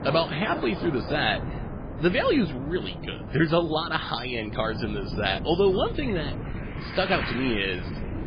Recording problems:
garbled, watery; badly; nothing above 4.5 kHz
rain or running water; noticeable; throughout; 15 dB below the speech
wind noise on the microphone; occasional gusts; 15 dB below the speech

